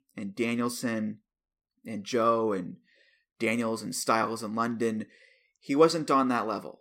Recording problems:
none

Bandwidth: 16 kHz